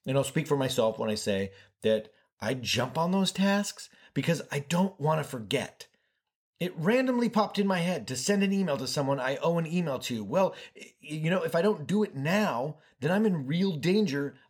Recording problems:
none

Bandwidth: 18.5 kHz